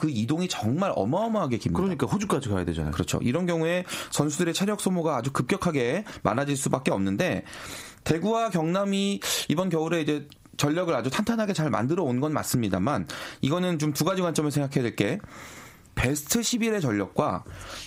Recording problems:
squashed, flat; heavily

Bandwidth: 15.5 kHz